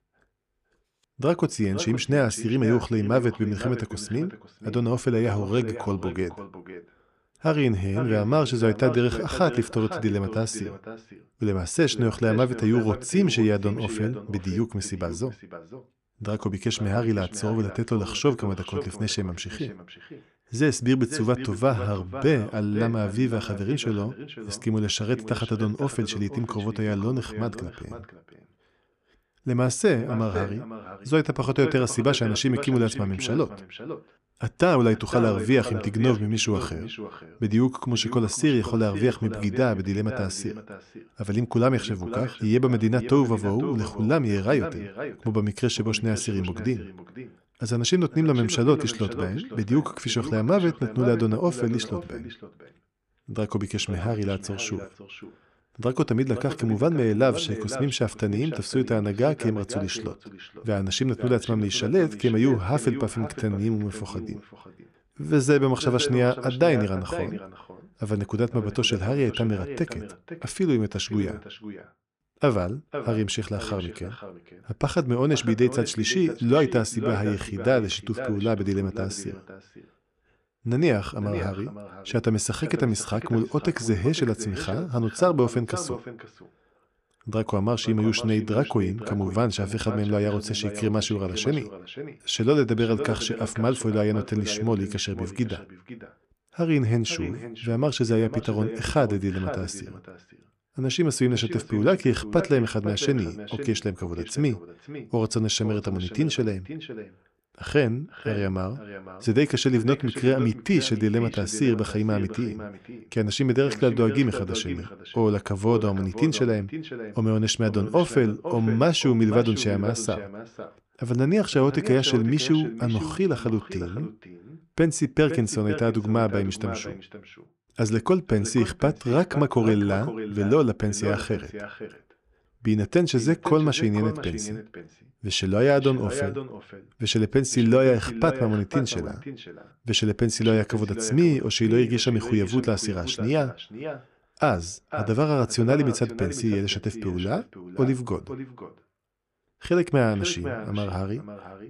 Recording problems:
echo of what is said; noticeable; throughout; 510 ms later, 10 dB below the speech

